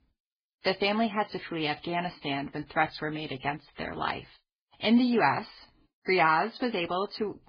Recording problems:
garbled, watery; badly; nothing above 4.5 kHz

